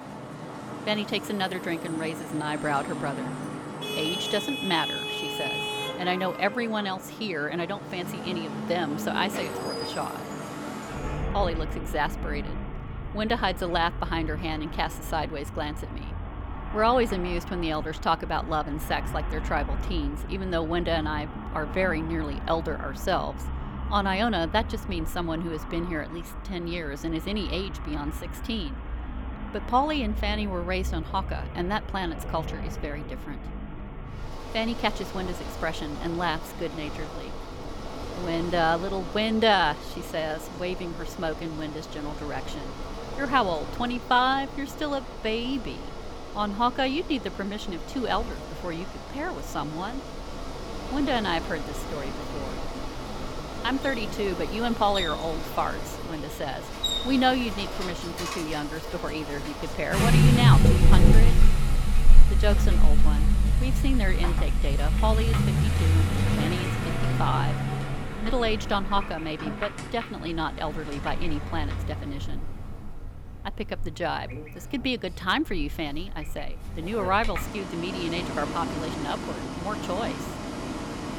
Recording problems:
traffic noise; loud; throughout; 1 dB below the speech

